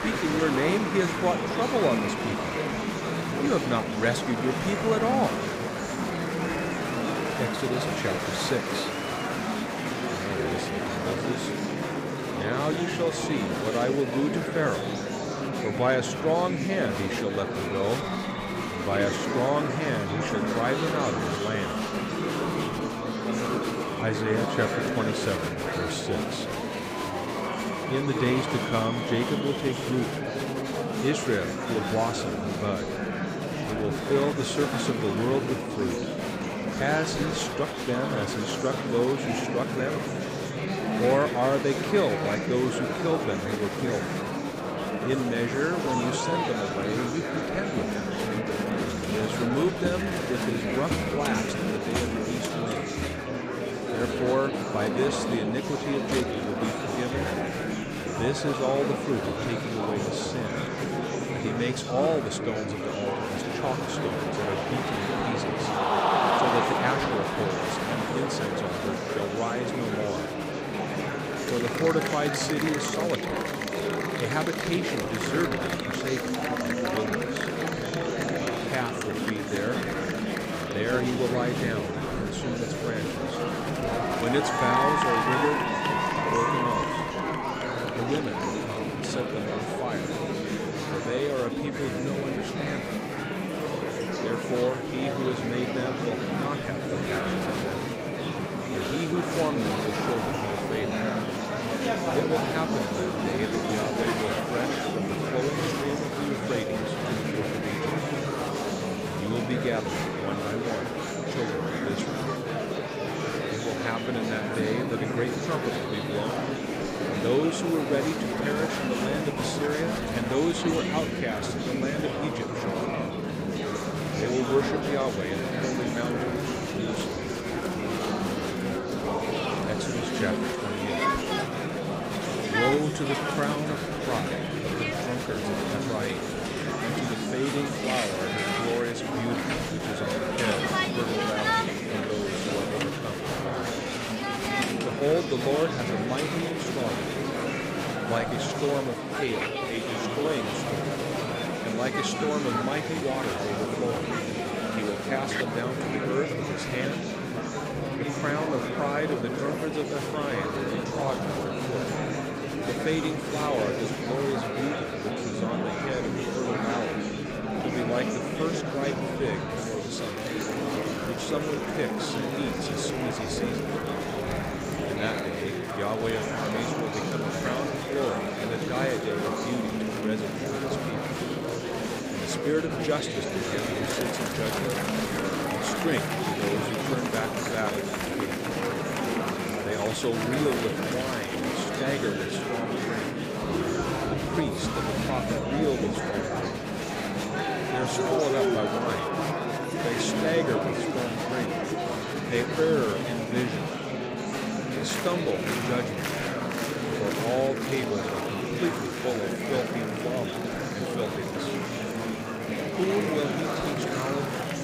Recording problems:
murmuring crowd; very loud; throughout; 2 dB above the speech

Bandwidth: 15.5 kHz